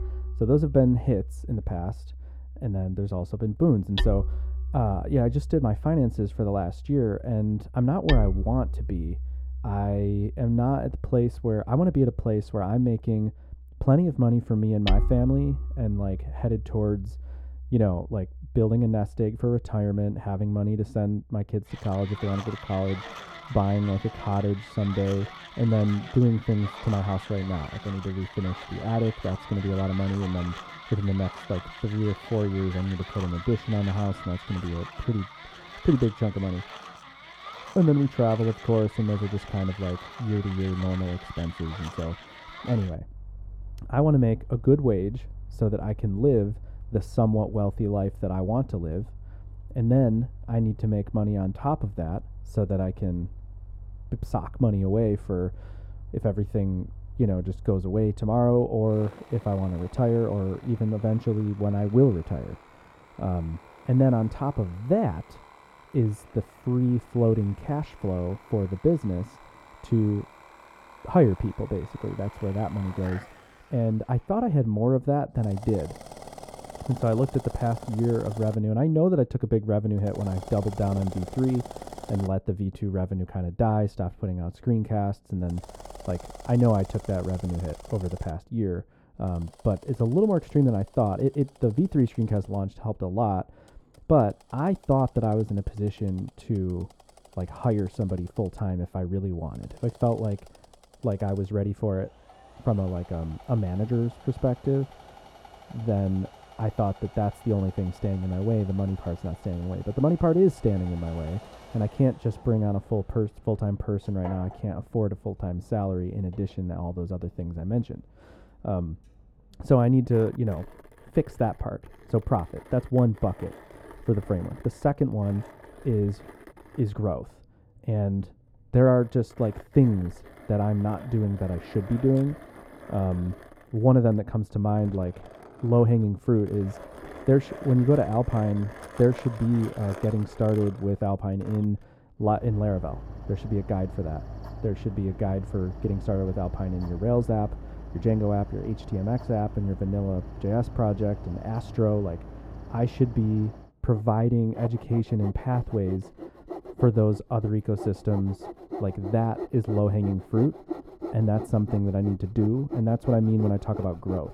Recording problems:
muffled; very; fading above 1 kHz
machinery noise; noticeable; throughout; 15 dB below the speech

